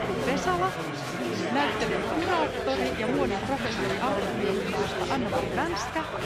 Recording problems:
chatter from many people; very loud; throughout; 2 dB above the speech

